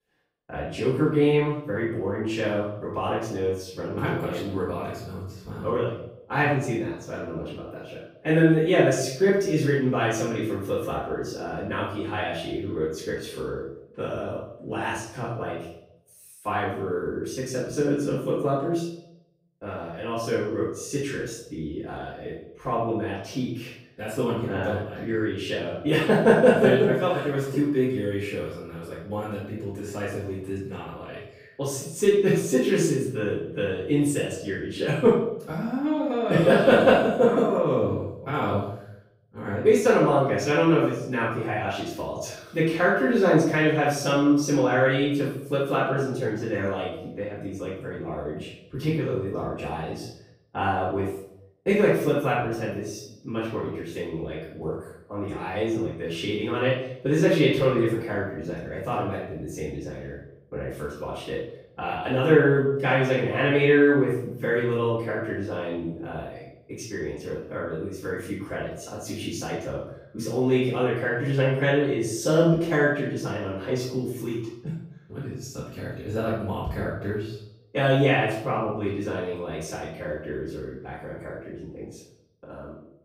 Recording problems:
off-mic speech; far
room echo; noticeable; dies away in 0.7 s

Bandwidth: 15.5 kHz